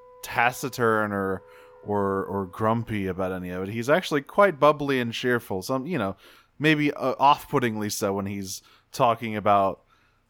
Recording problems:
background music; faint; throughout; 30 dB below the speech

